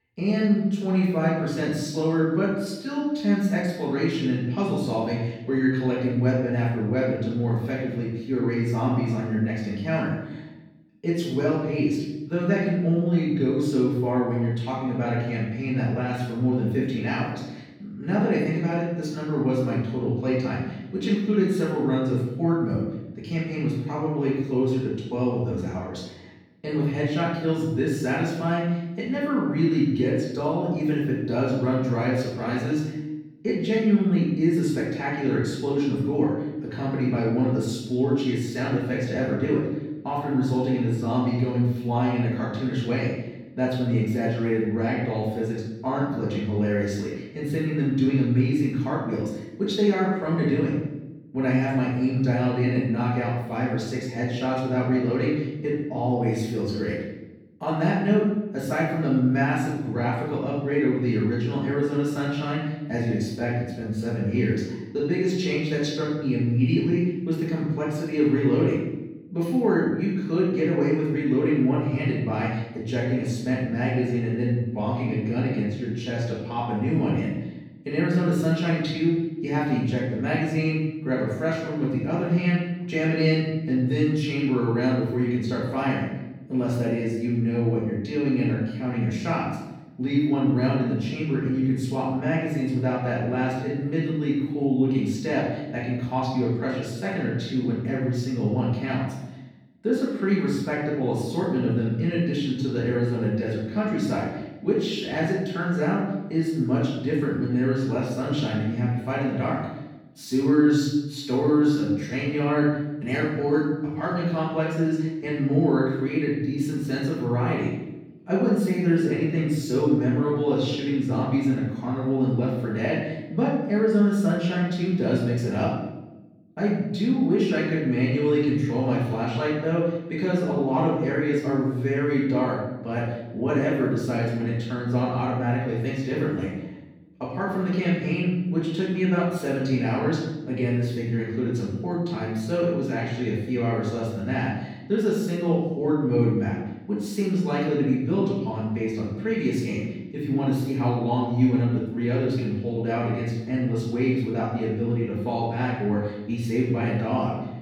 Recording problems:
off-mic speech; far
room echo; noticeable; dies away in 0.9 s

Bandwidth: 18.5 kHz